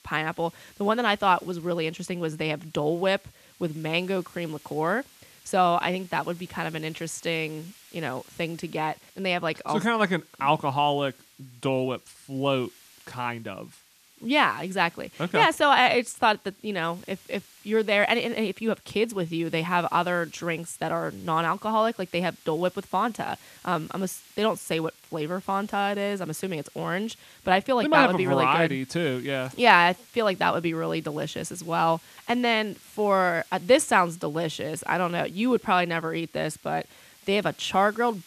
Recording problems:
hiss; faint; throughout; 25 dB below the speech

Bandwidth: 14.5 kHz